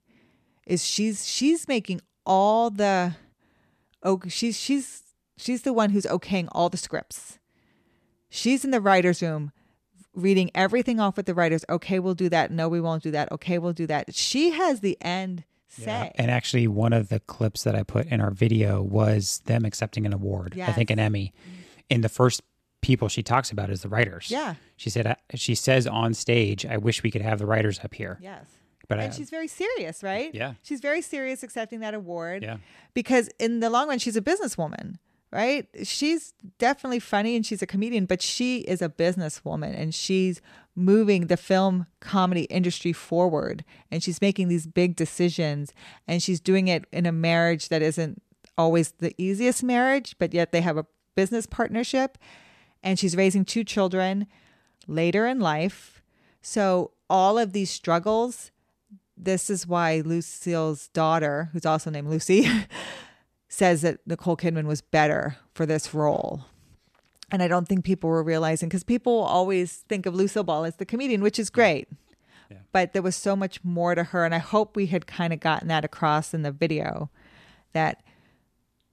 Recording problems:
none

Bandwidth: 14 kHz